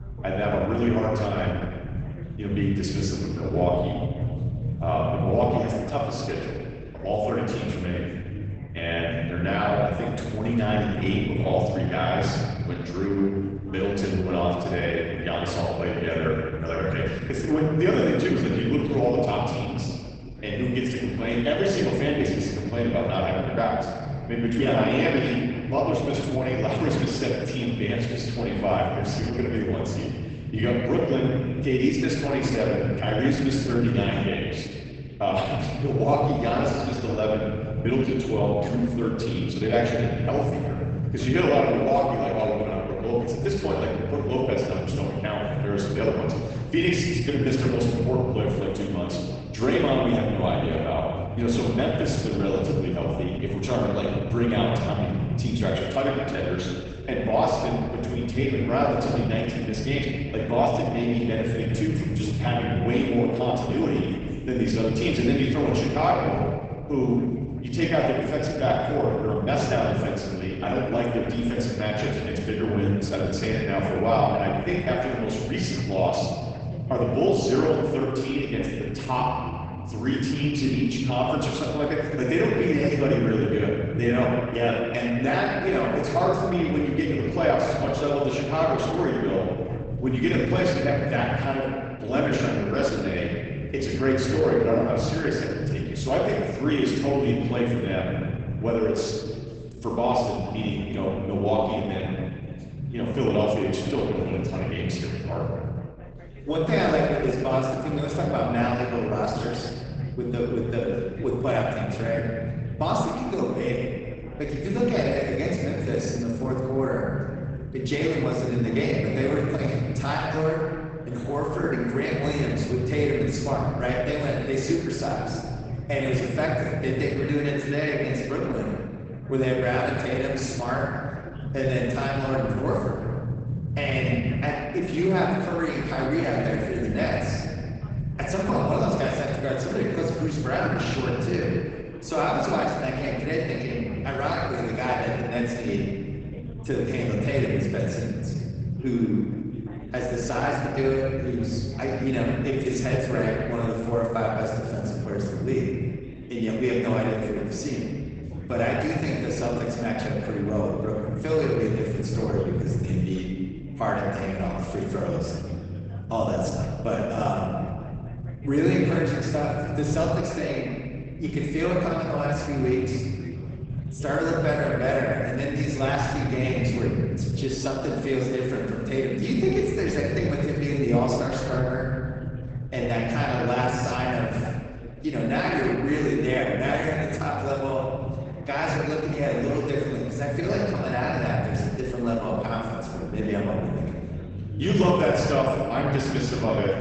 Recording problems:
off-mic speech; far
garbled, watery; badly; nothing above 8 kHz
room echo; noticeable; dies away in 1.9 s
low rumble; noticeable; throughout; 20 dB below the speech
background chatter; faint; throughout; 2 voices, 20 dB below the speech

